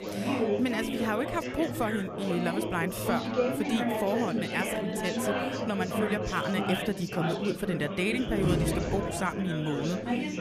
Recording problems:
chatter from many people; loud; throughout; as loud as the speech
door banging; loud; from 8 to 9 s; peak 3 dB above the speech

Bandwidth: 14.5 kHz